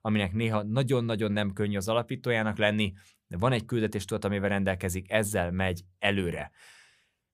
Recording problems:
none

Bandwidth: 15 kHz